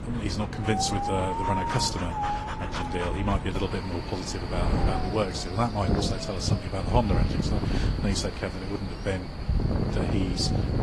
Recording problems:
garbled, watery; slightly
wind noise on the microphone; heavy; 2 dB below the speech
animal sounds; noticeable; throughout; 10 dB below the speech

